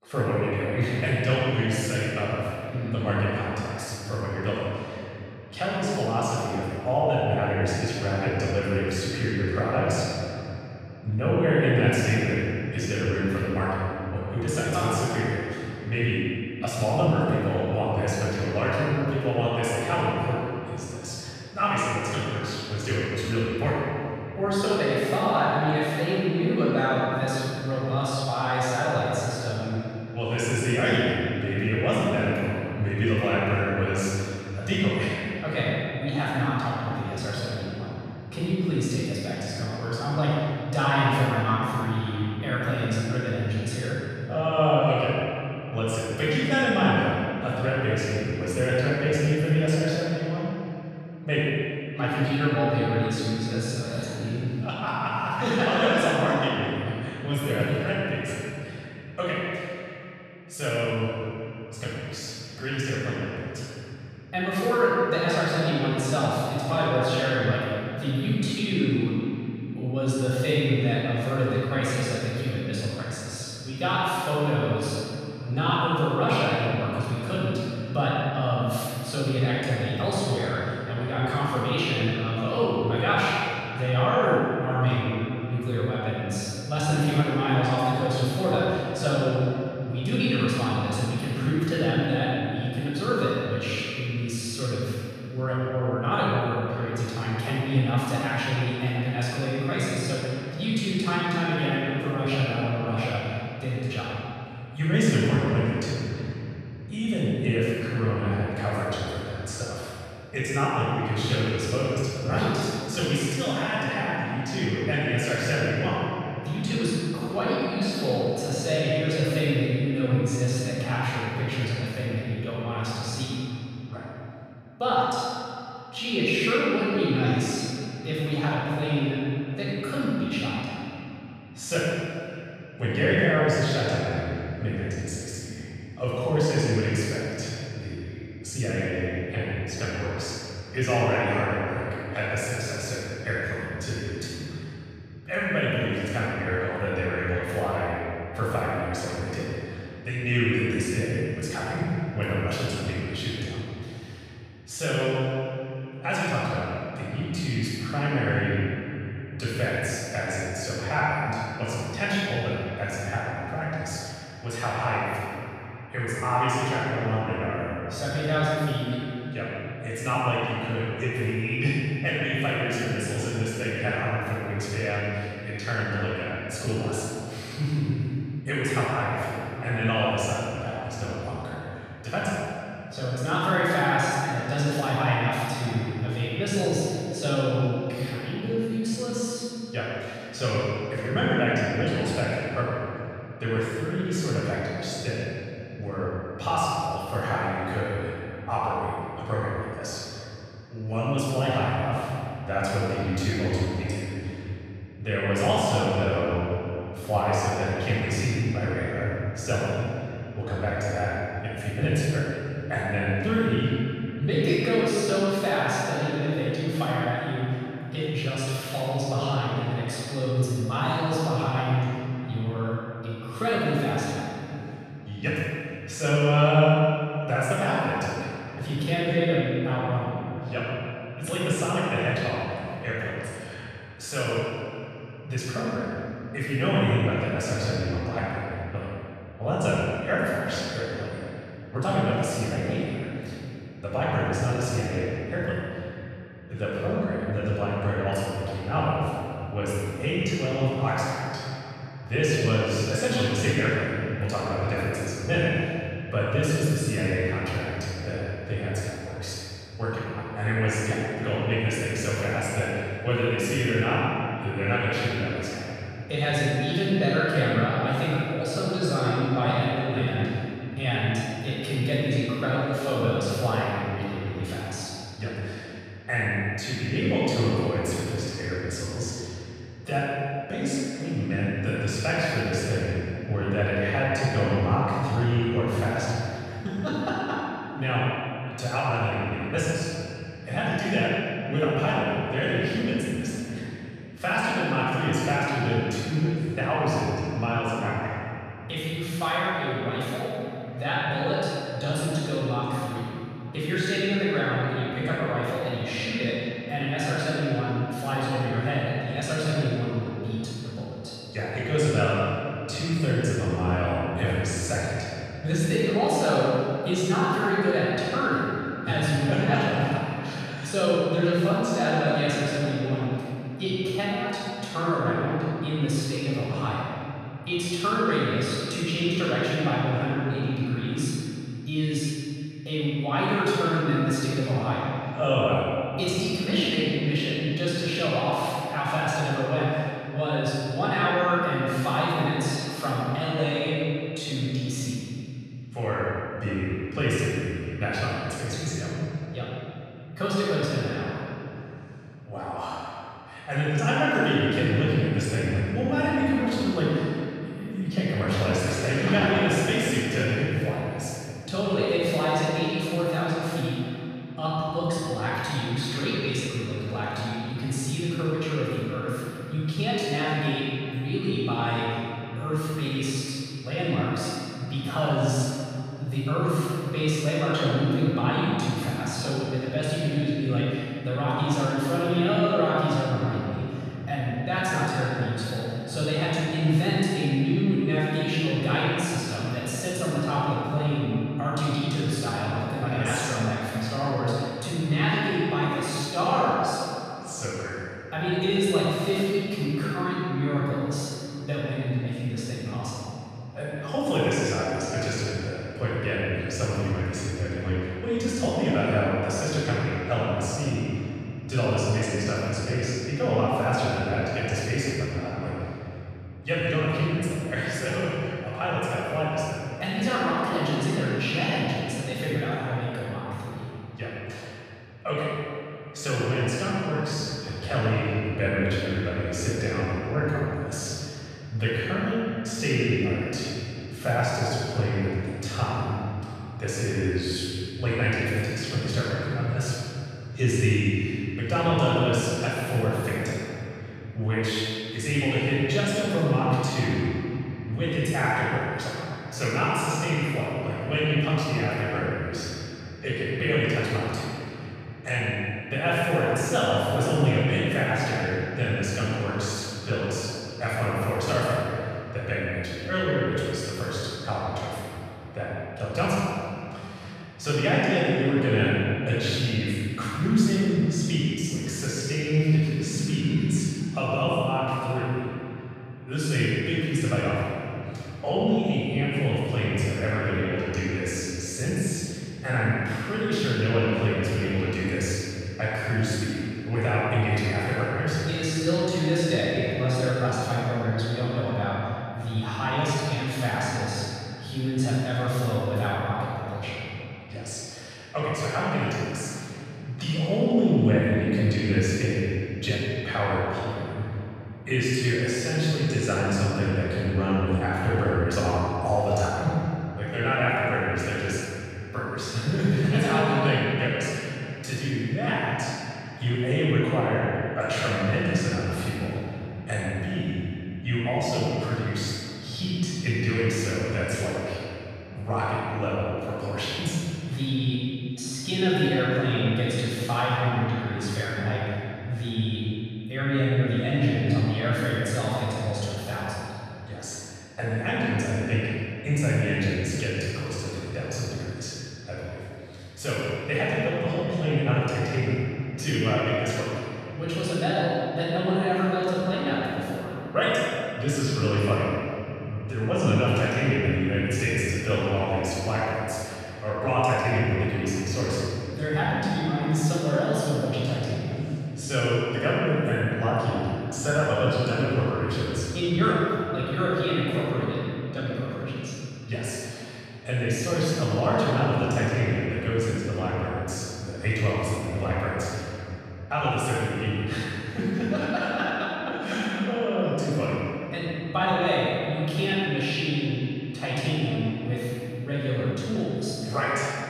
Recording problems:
room echo; strong; dies away in 3 s
off-mic speech; far

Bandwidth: 14.5 kHz